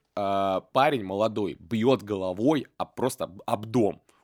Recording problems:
none

